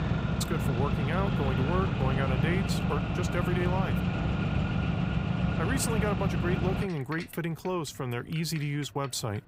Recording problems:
traffic noise; very loud; throughout; 3 dB above the speech

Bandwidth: 15.5 kHz